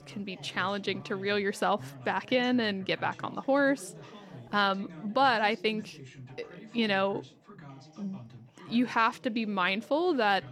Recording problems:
background chatter; noticeable; throughout; 2 voices, 20 dB below the speech

